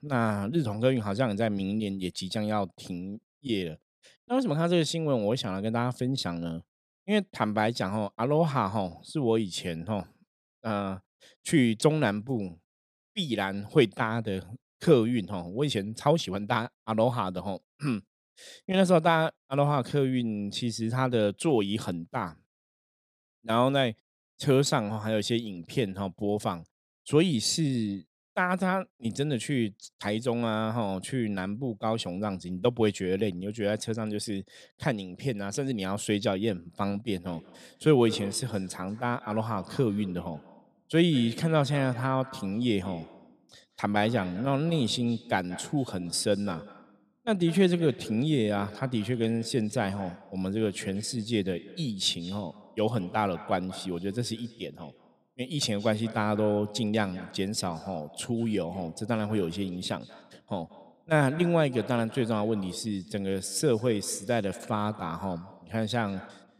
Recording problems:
echo of what is said; faint; from 37 s on; 180 ms later, 20 dB below the speech

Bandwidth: 14.5 kHz